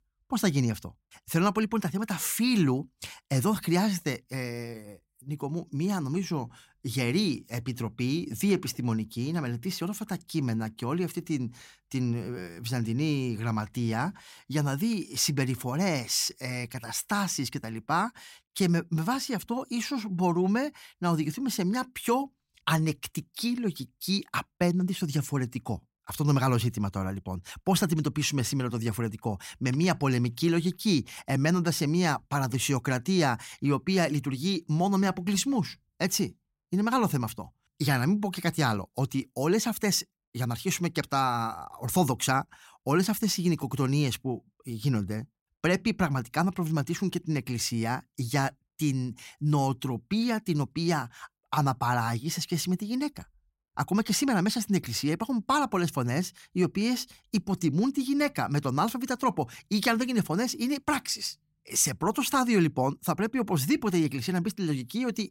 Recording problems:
none

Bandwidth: 16 kHz